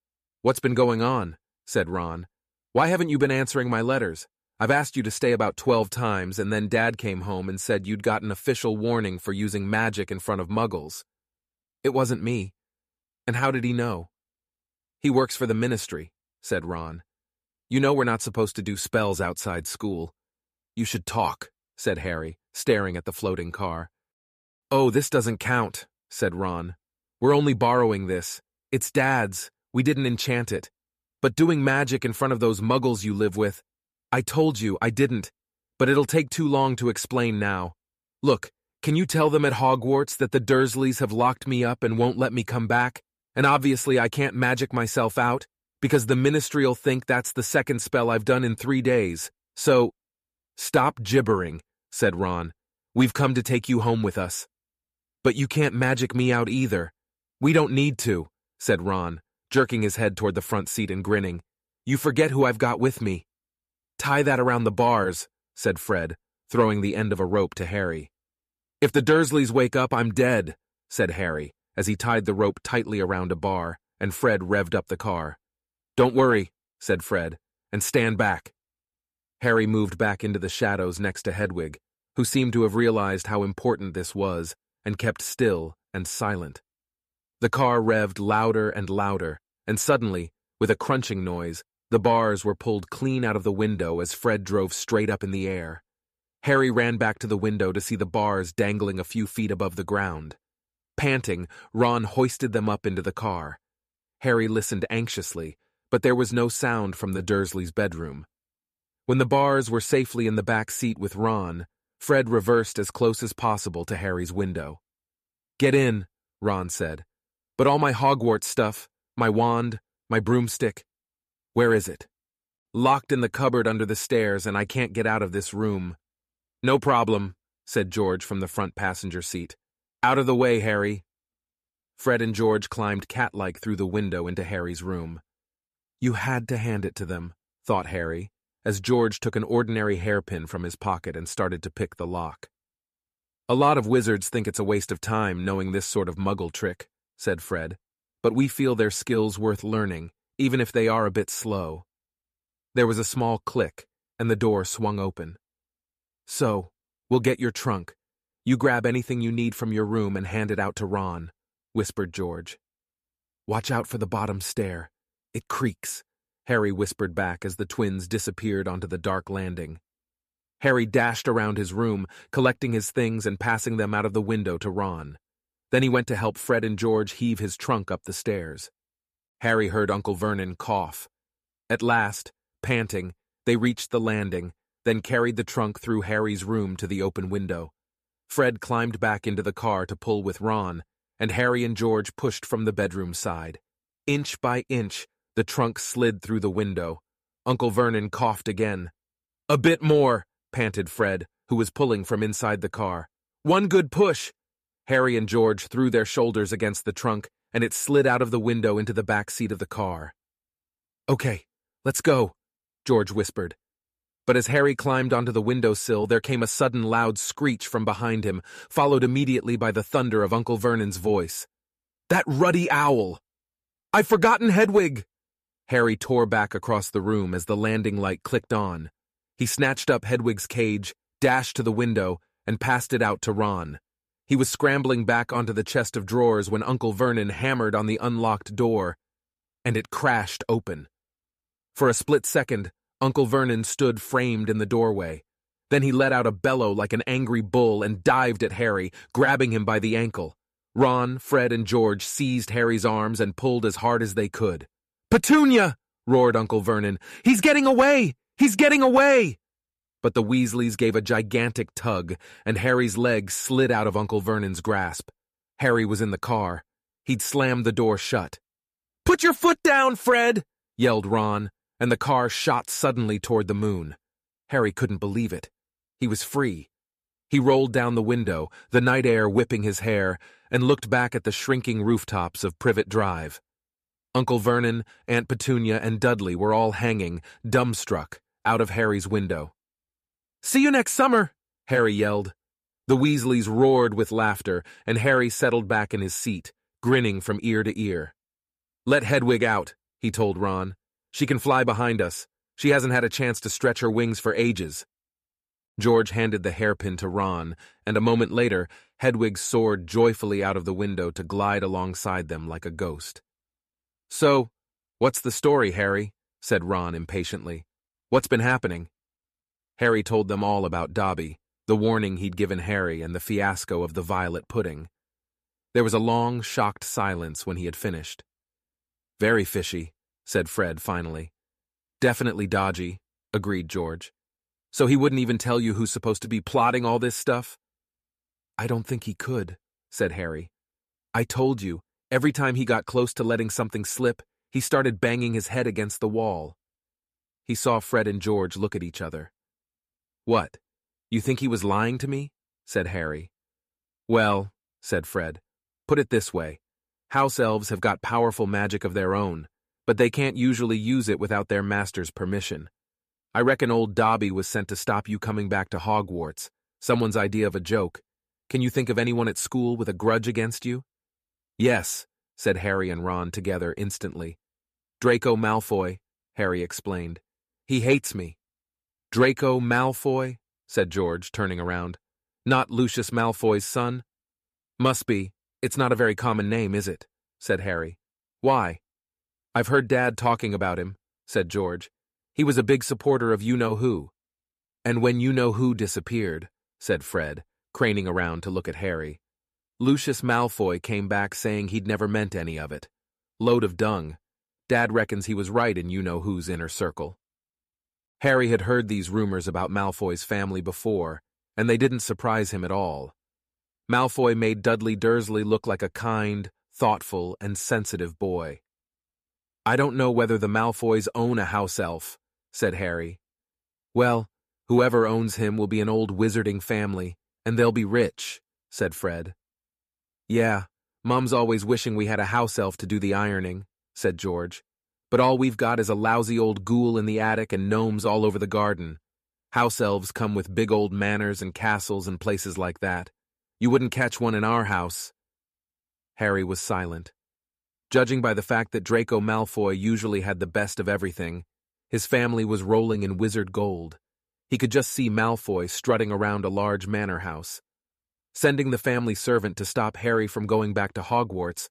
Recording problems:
none

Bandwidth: 14.5 kHz